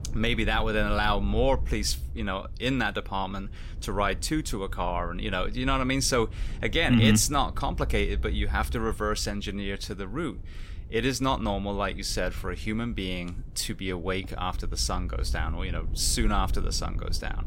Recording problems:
low rumble; faint; throughout; 25 dB below the speech

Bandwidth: 16 kHz